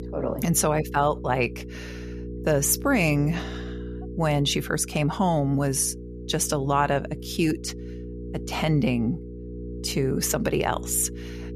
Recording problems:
electrical hum; noticeable; throughout; 60 Hz, 15 dB below the speech

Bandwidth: 14.5 kHz